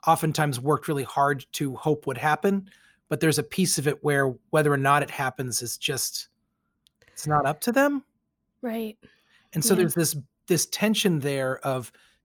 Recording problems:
none

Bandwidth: 18.5 kHz